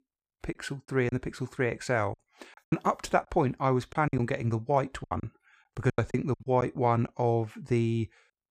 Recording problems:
choppy; very; 9% of the speech affected

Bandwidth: 15 kHz